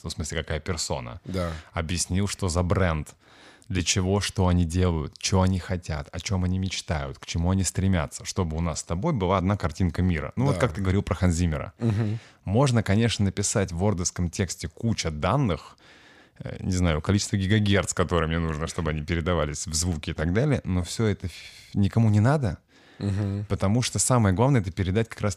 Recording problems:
none

